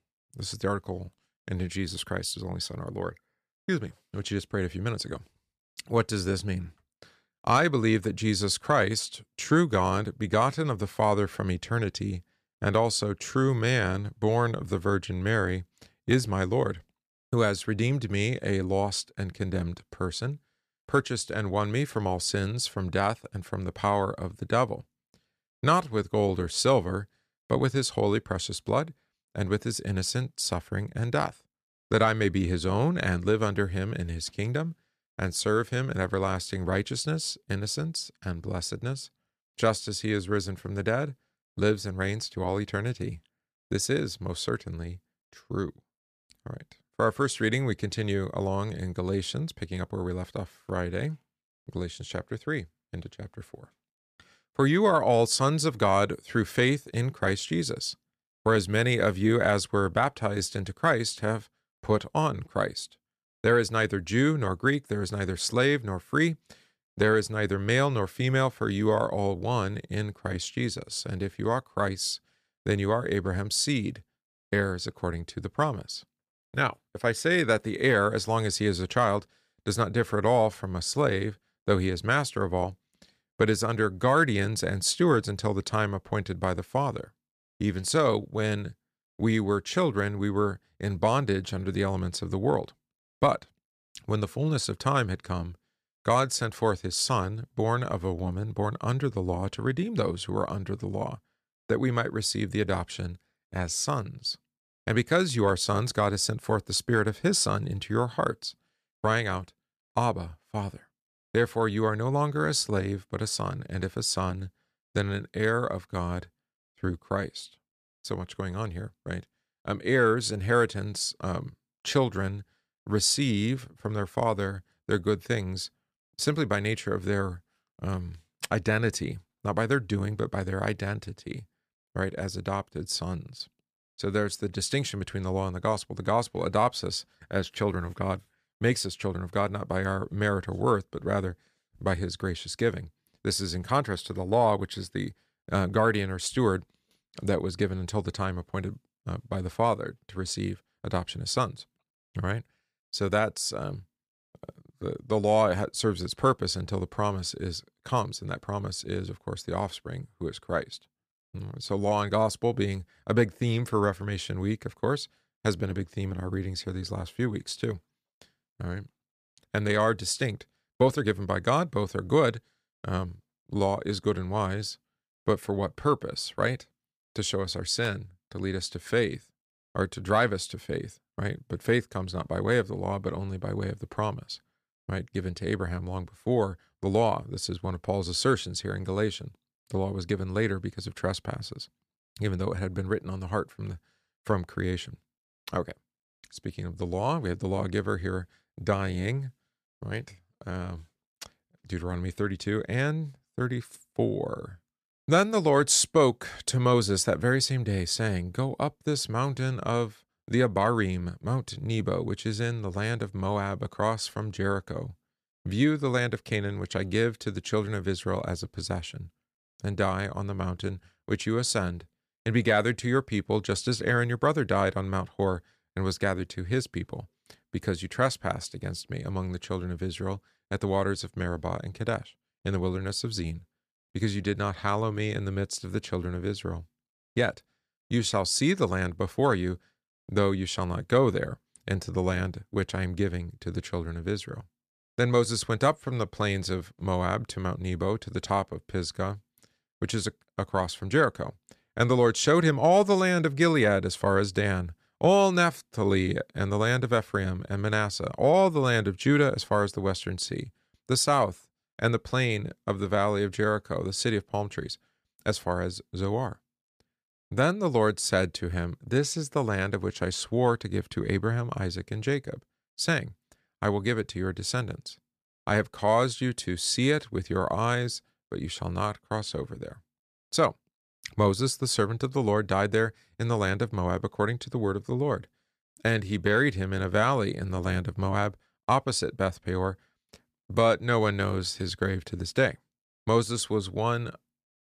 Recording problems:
none

